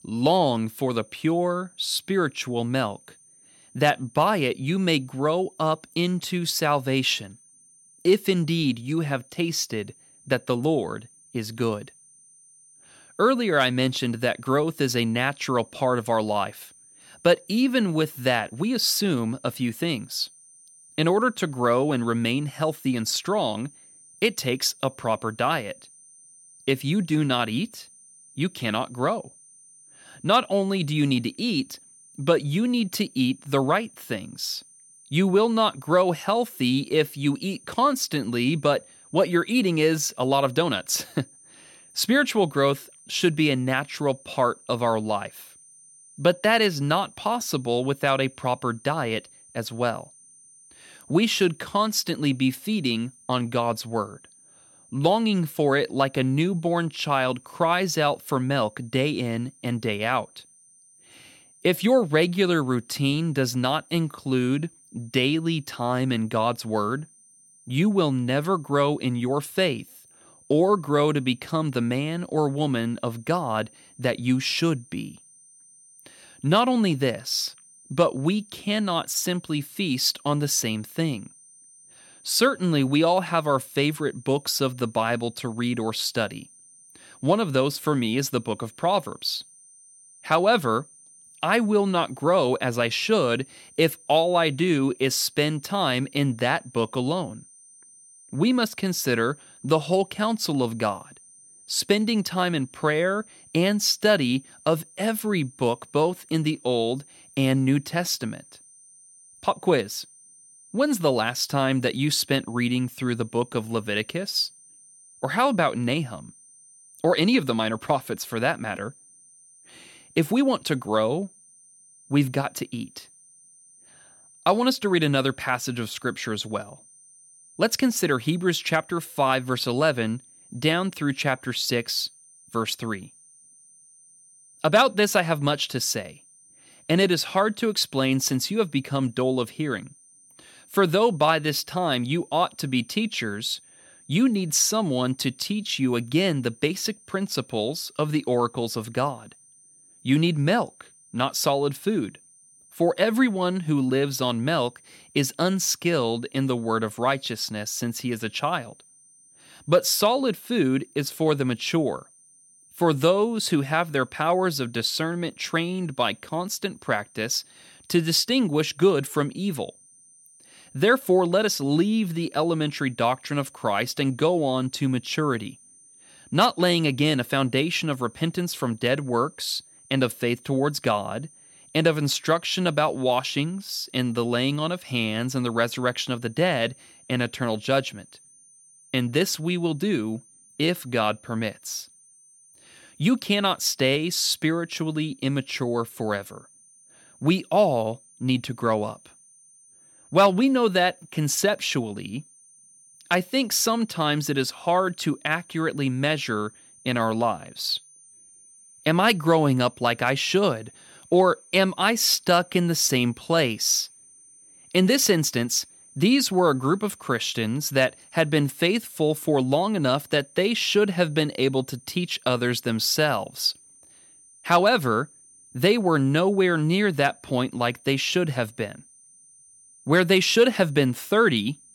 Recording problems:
high-pitched whine; faint; throughout; 9 kHz, 25 dB below the speech

